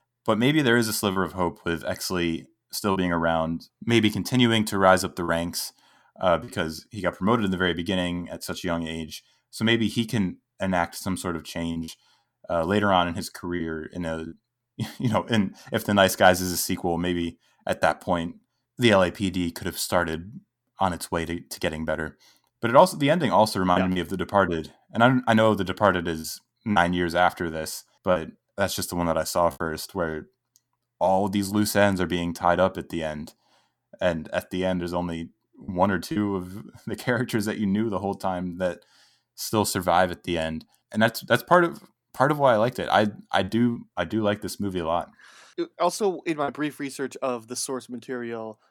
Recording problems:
choppy; occasionally; 2% of the speech affected

